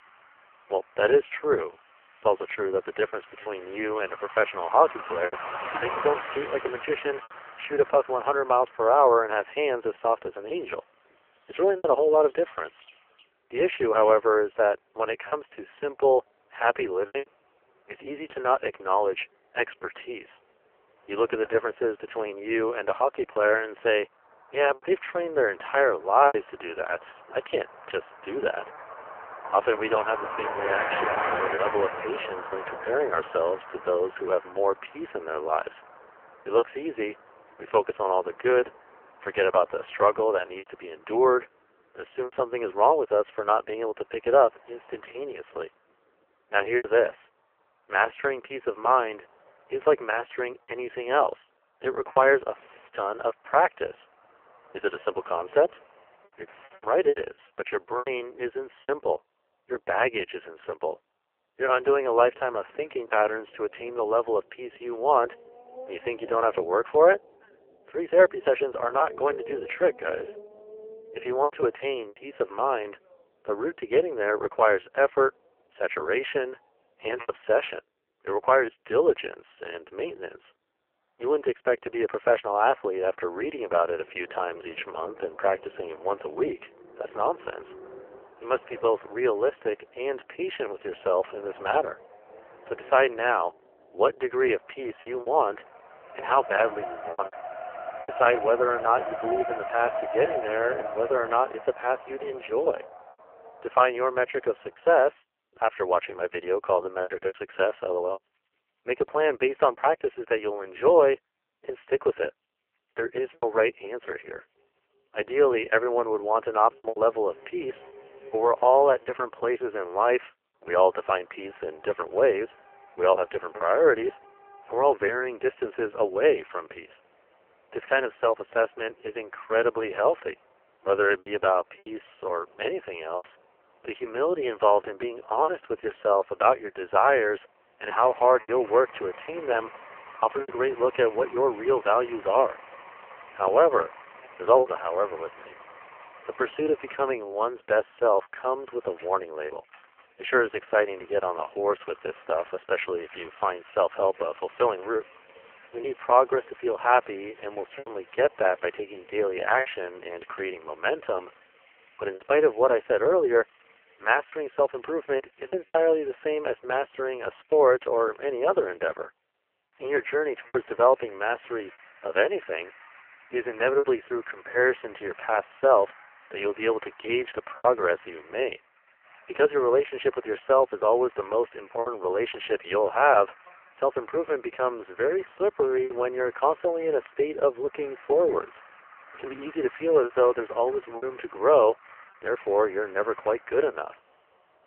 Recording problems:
phone-call audio; poor line; nothing above 3 kHz
traffic noise; noticeable; throughout; 15 dB below the speech
choppy; occasionally; 3% of the speech affected

